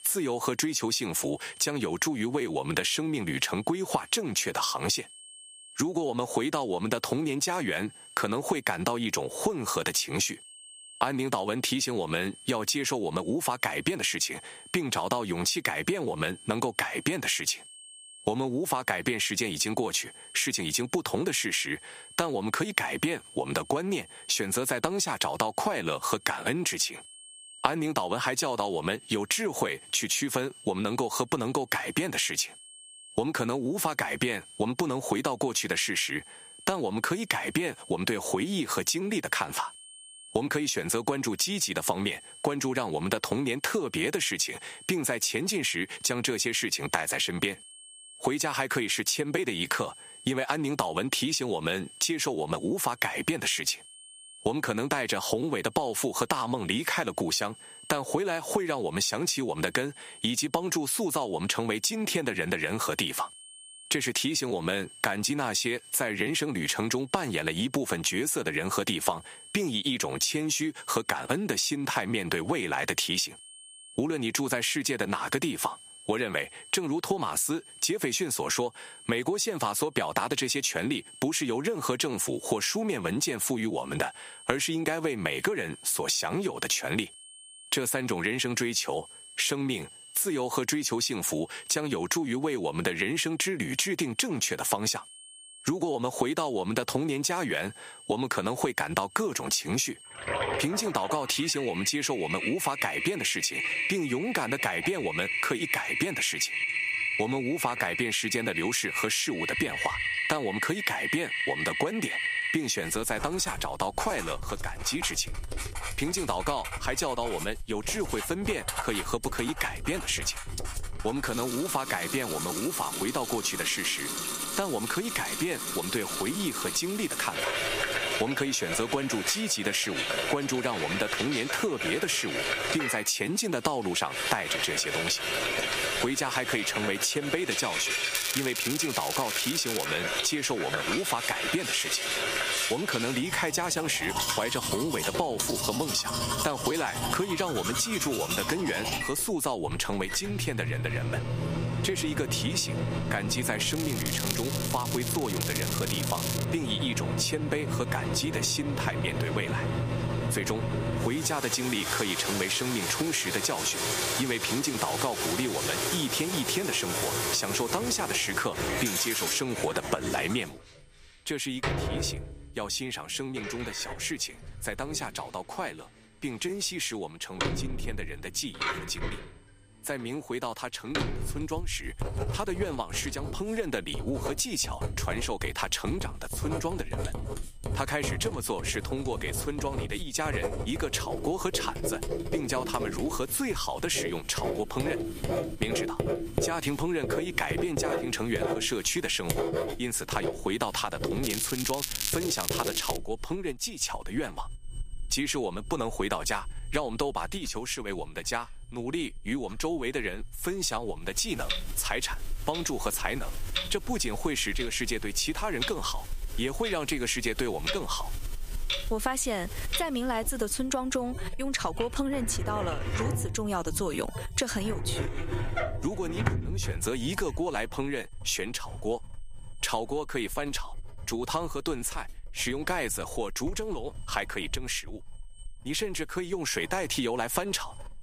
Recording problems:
squashed, flat; somewhat, background pumping
household noises; loud; from 1:41 on; 4 dB below the speech
crackling; loud; from 2:18 to 2:20, from 2:34 to 2:36 and from 3:21 to 3:23; 3 dB below the speech
high-pitched whine; faint; throughout; 8.5 kHz, 25 dB below the speech

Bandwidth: 15 kHz